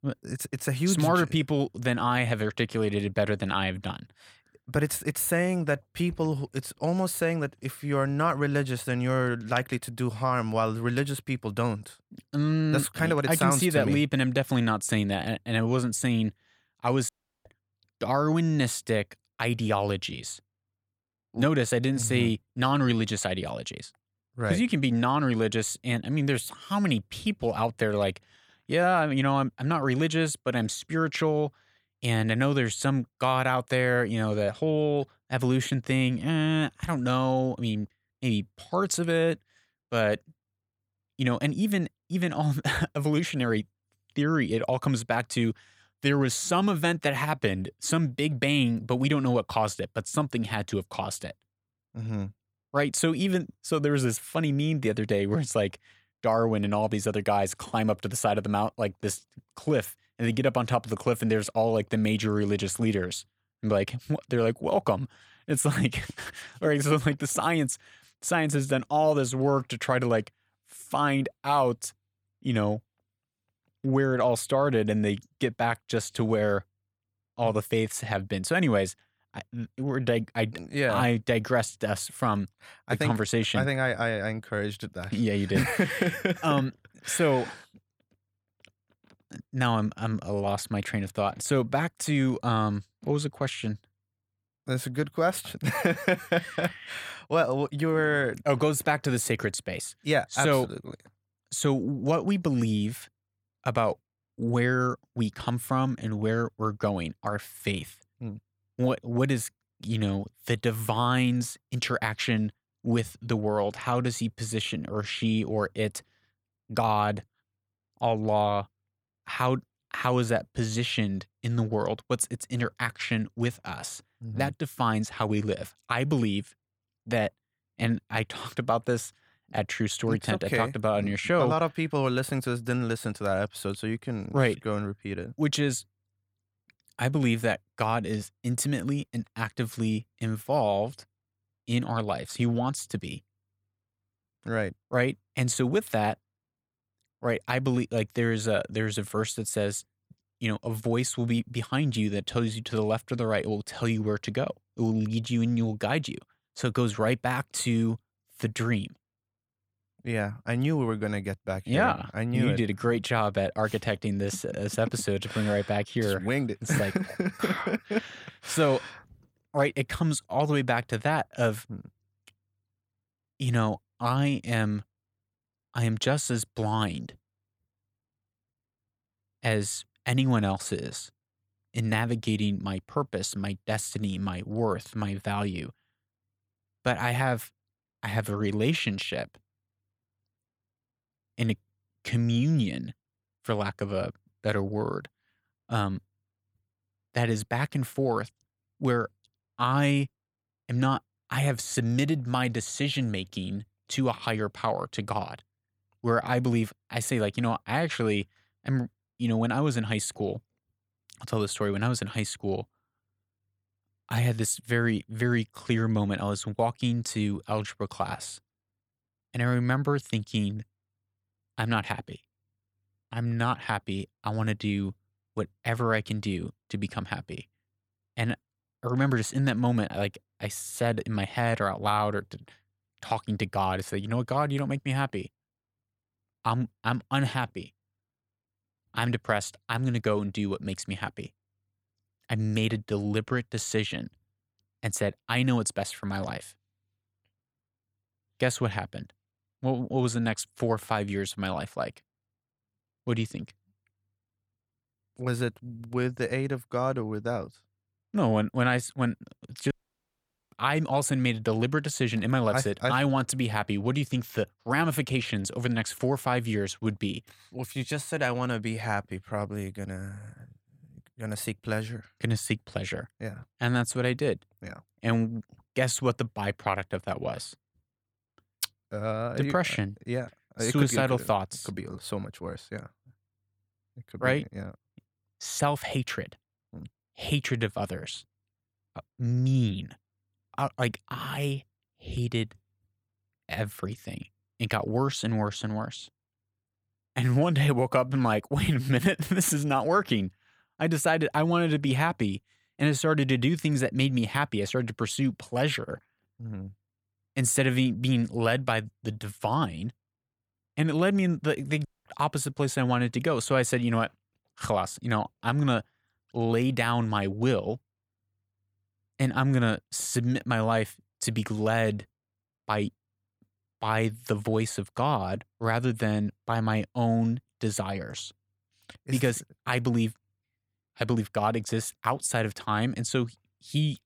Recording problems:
audio cutting out; at 17 s, at 4:20 for 1 s and at 5:12

